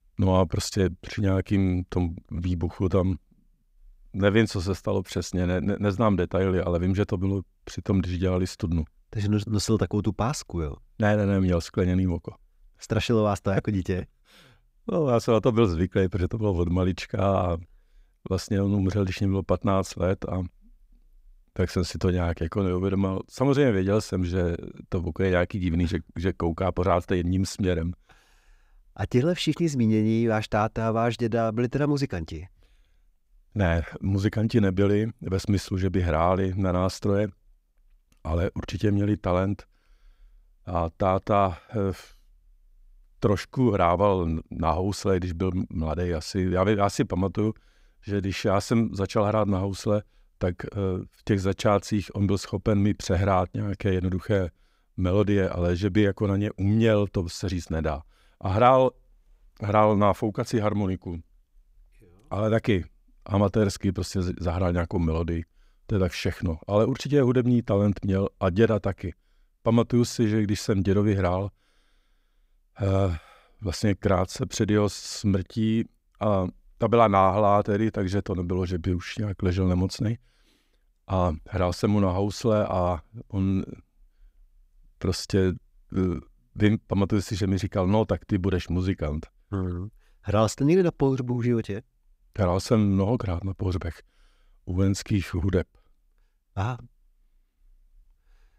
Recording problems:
none

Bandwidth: 15.5 kHz